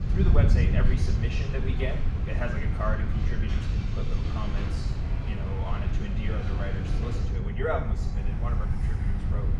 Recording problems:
off-mic speech; far
room echo; noticeable; dies away in 0.7 s
wind noise on the microphone; heavy; 6 dB below the speech
train or aircraft noise; loud; throughout; 8 dB below the speech

